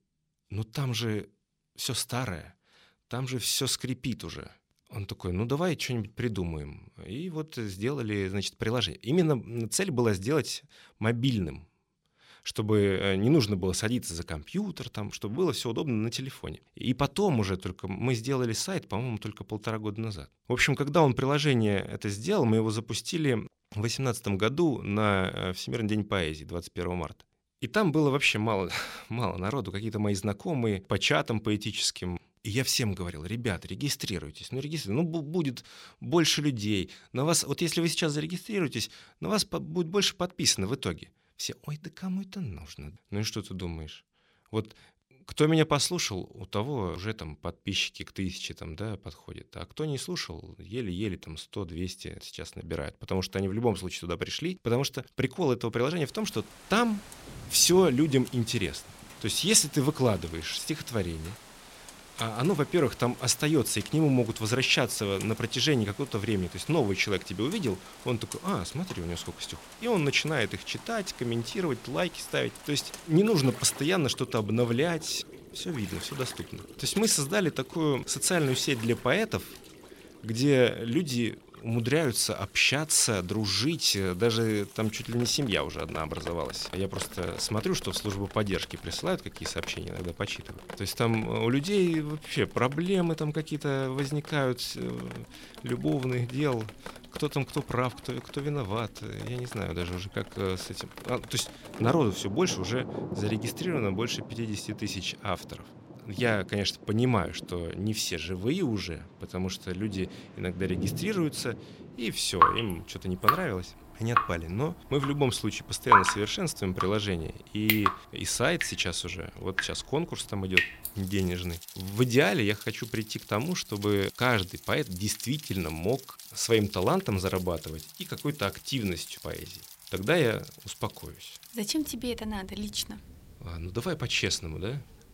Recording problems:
rain or running water; loud; from 56 s on; 8 dB below the speech

